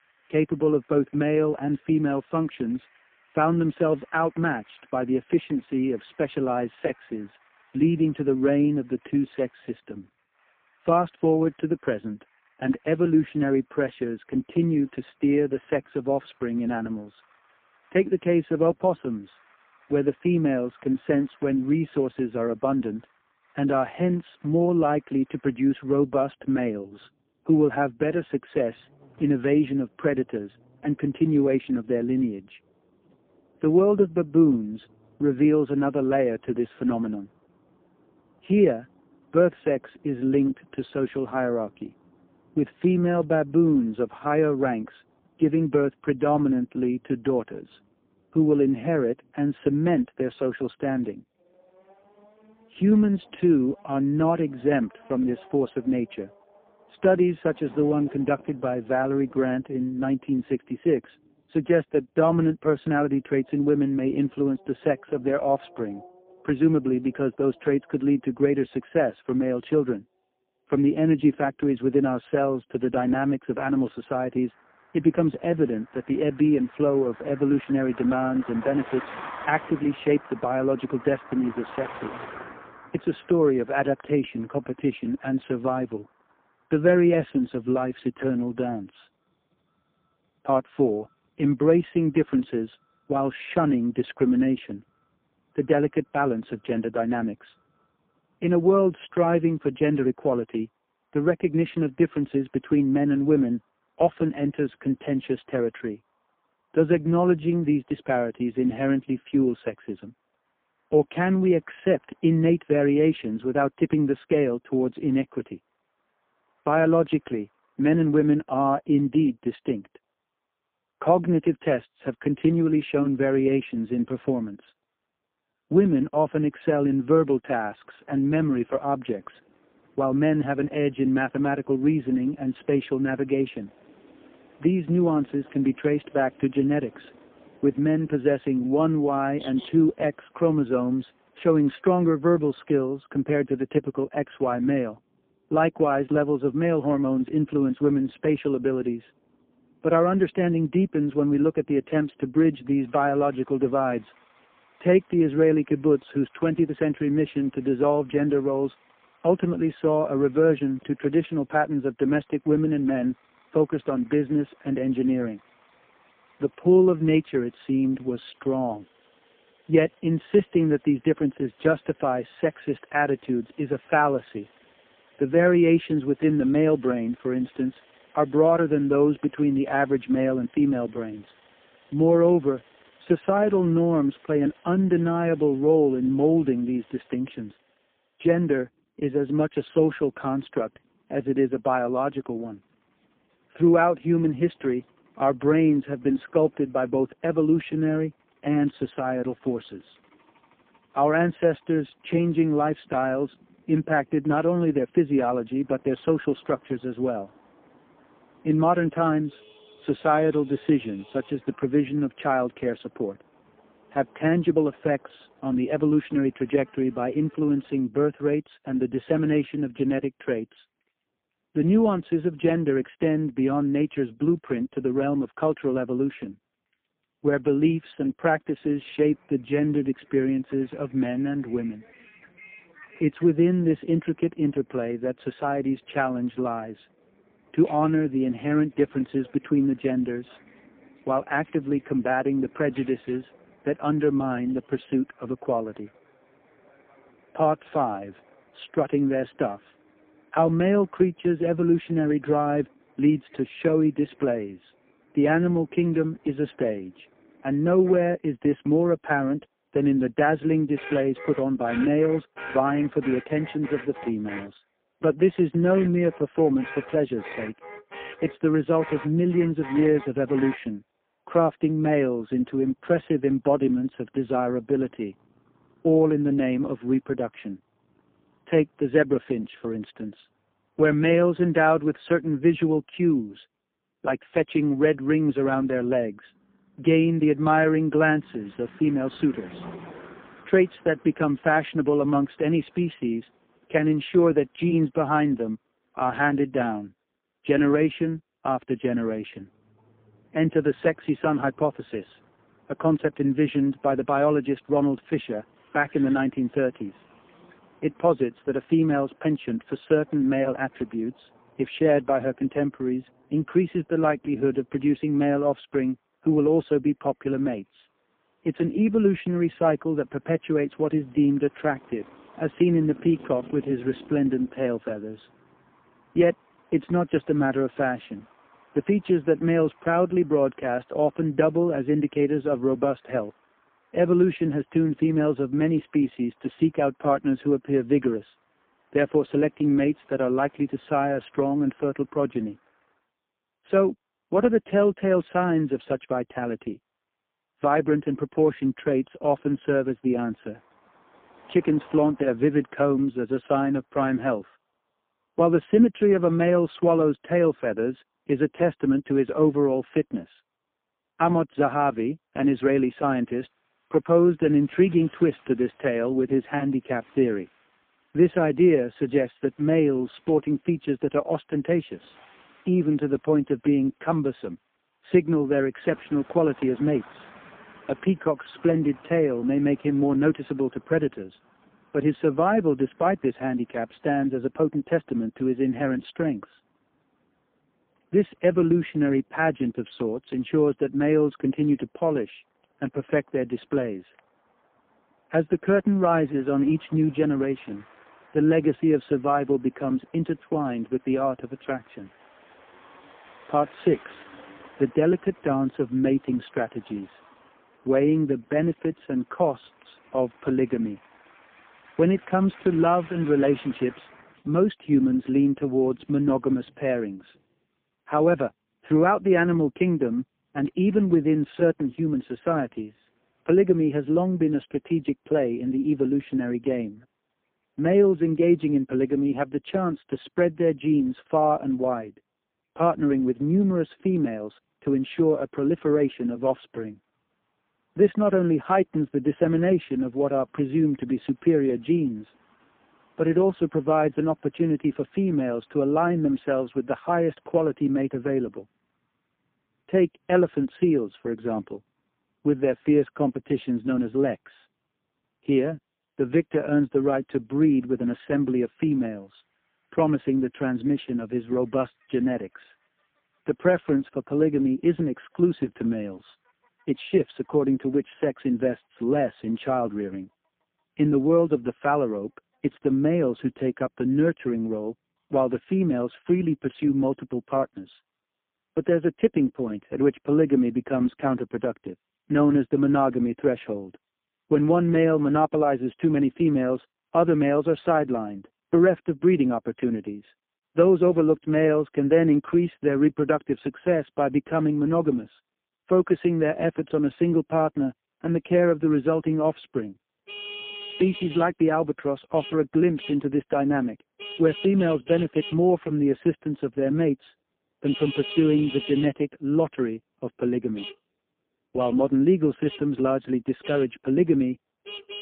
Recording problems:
phone-call audio; poor line
traffic noise; faint; throughout; 20 dB below the speech

